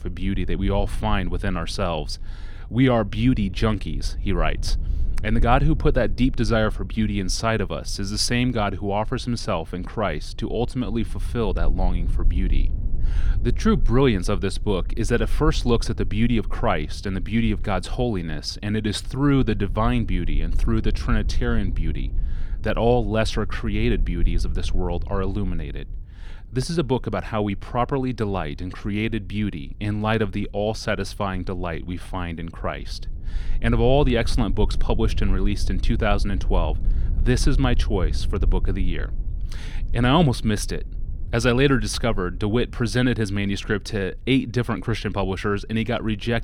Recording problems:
low rumble; faint; throughout; 25 dB below the speech

